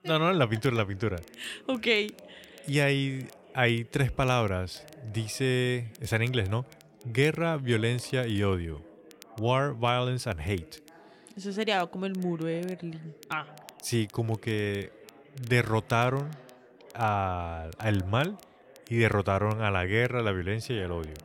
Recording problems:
background chatter; faint; throughout; 4 voices, 25 dB below the speech
crackle, like an old record; faint; 25 dB below the speech

